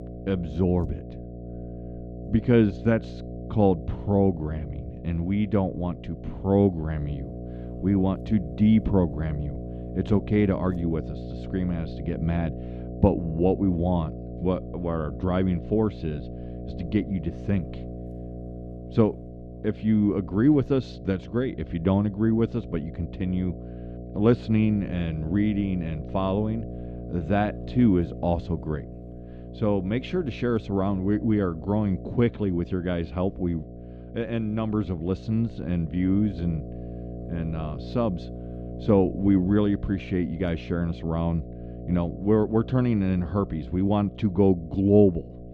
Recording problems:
muffled; slightly; fading above 4 kHz
electrical hum; noticeable; throughout; 60 Hz, 15 dB below the speech

